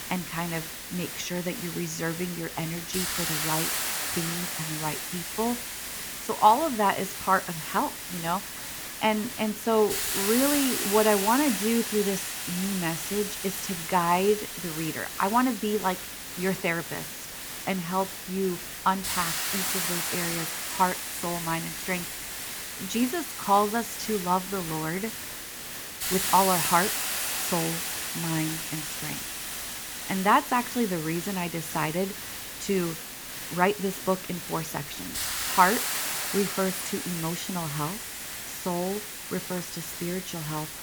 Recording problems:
hiss; loud; throughout; 3 dB below the speech

